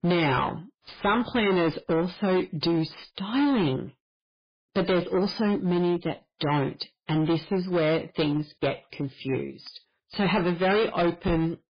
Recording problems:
distortion; heavy; 16% of the sound clipped
garbled, watery; badly; nothing above 5 kHz

